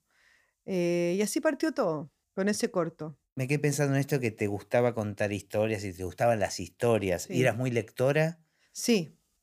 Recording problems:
none

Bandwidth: 15 kHz